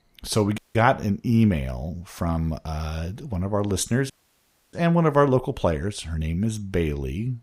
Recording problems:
audio cutting out; at 0.5 s and at 4 s for 0.5 s

